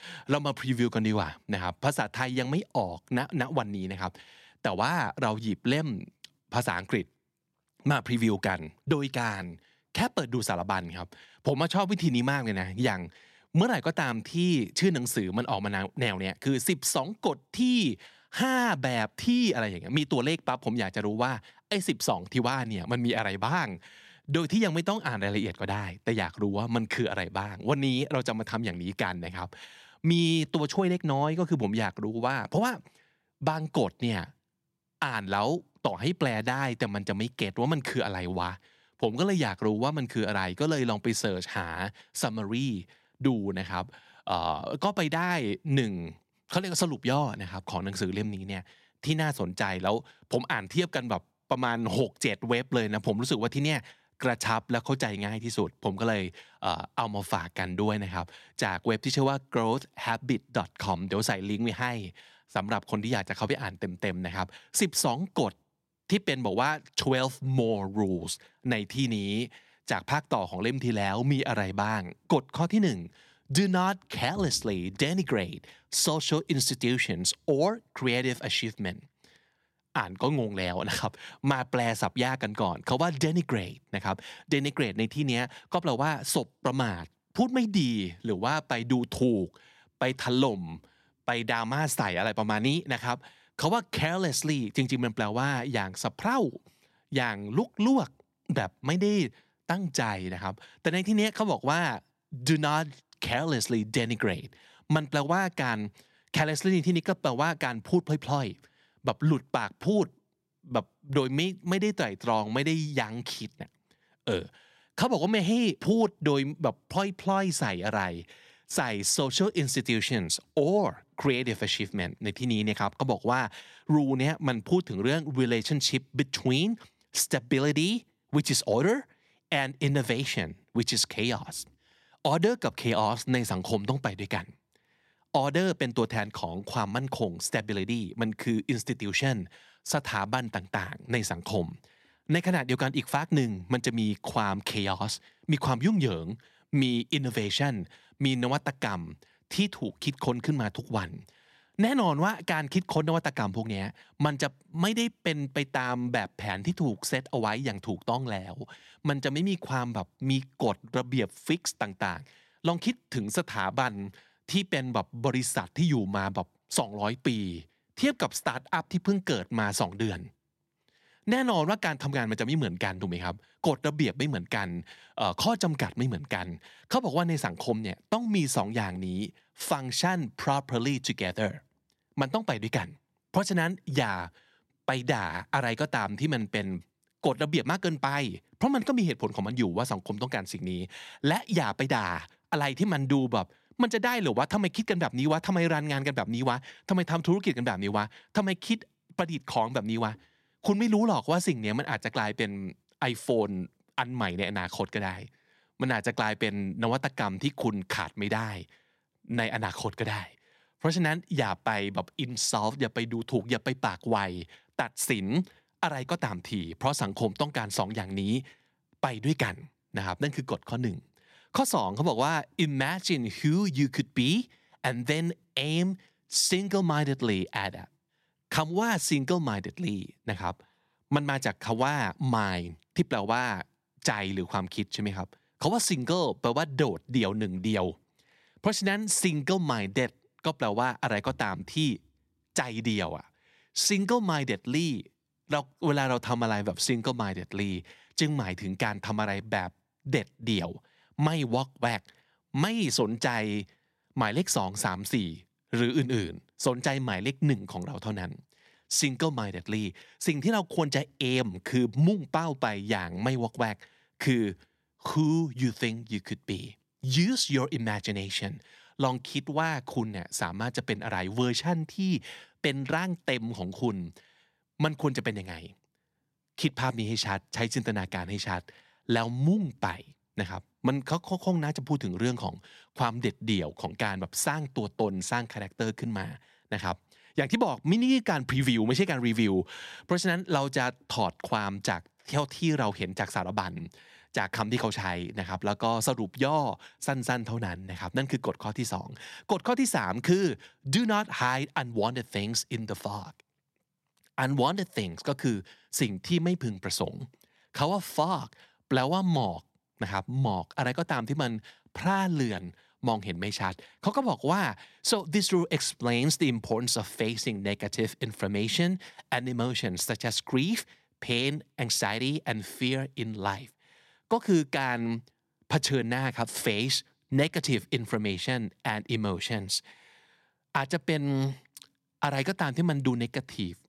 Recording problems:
none

